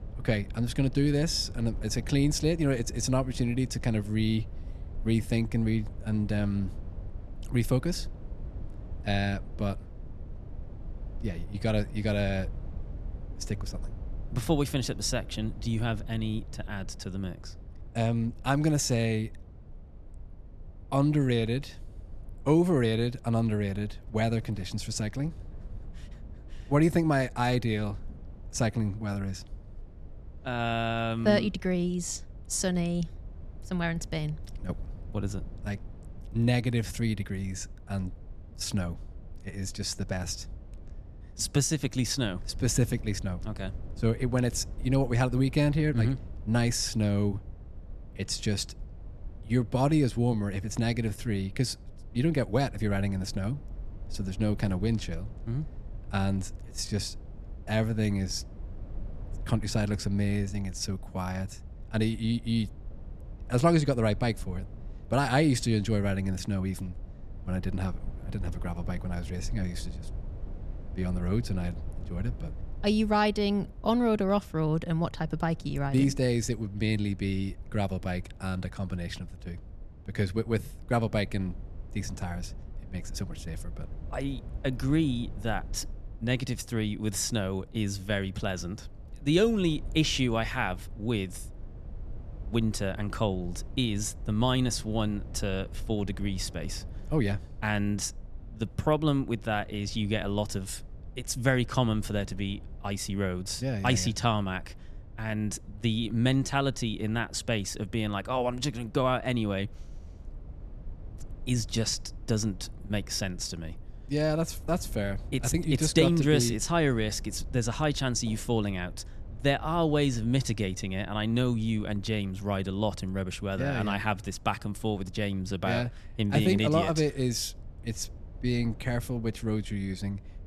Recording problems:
low rumble; faint; throughout; 25 dB below the speech

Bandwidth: 13.5 kHz